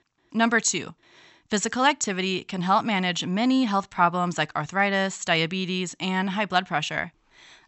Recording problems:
high frequencies cut off; noticeable; nothing above 8 kHz

